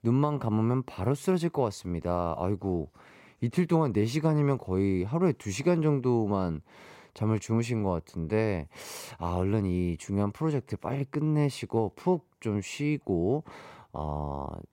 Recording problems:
none

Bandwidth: 16 kHz